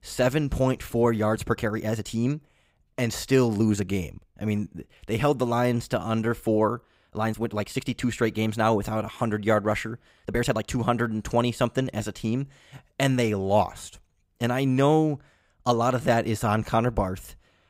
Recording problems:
uneven, jittery; strongly; from 1.5 to 16 s

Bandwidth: 15.5 kHz